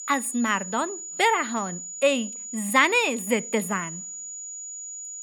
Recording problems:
high-pitched whine; loud; throughout; 7 kHz, 10 dB below the speech

